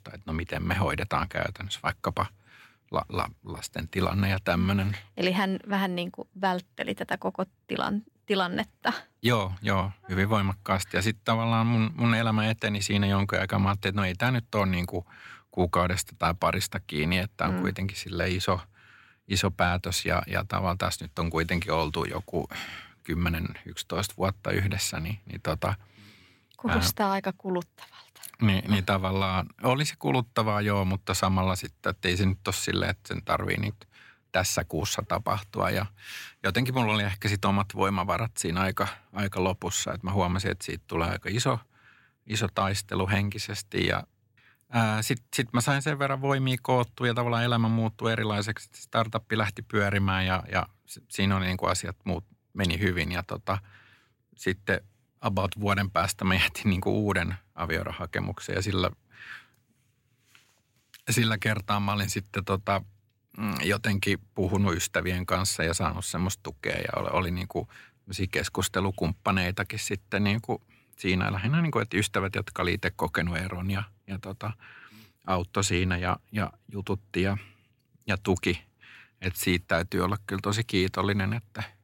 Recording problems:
none

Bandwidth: 16.5 kHz